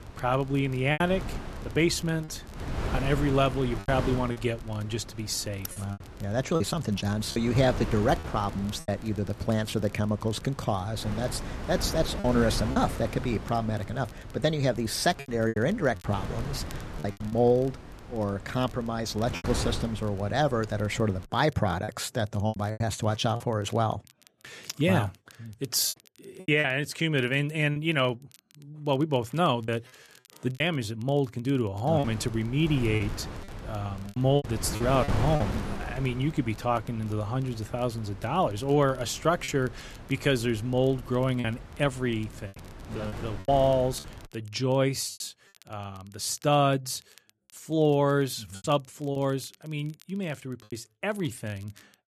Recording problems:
wind noise on the microphone; occasional gusts; until 21 s and from 32 to 44 s; 15 dB below the speech
crackle, like an old record; faint; 30 dB below the speech
choppy; very; 6% of the speech affected

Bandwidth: 14 kHz